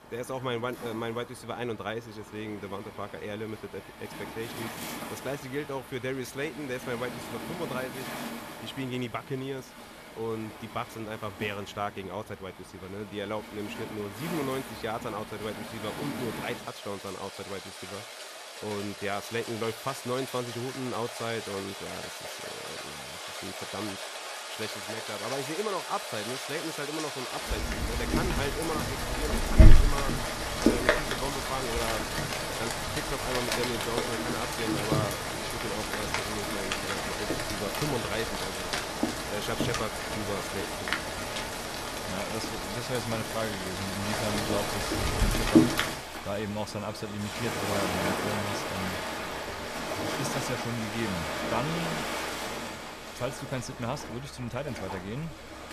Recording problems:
rain or running water; very loud; throughout; 4 dB above the speech

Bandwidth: 14.5 kHz